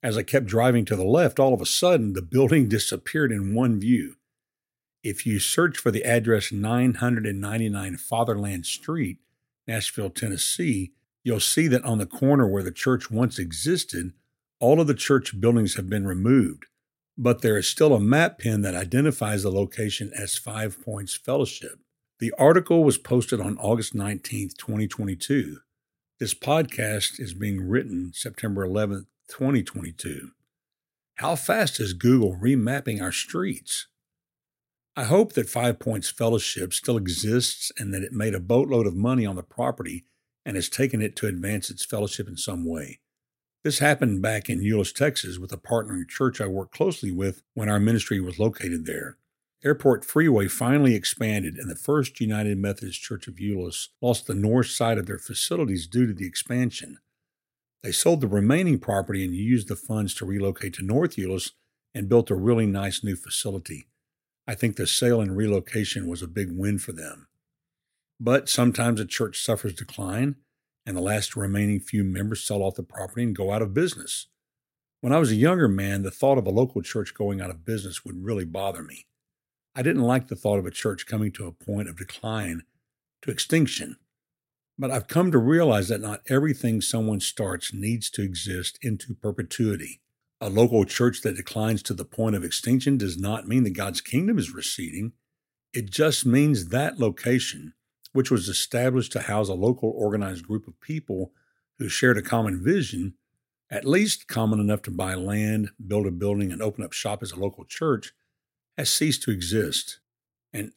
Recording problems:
none

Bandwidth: 16 kHz